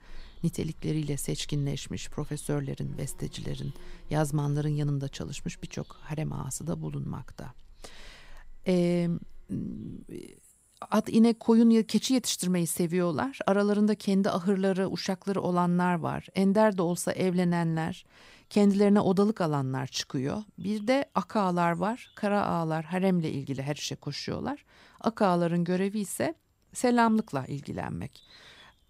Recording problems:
animal sounds; faint; throughout; 30 dB below the speech

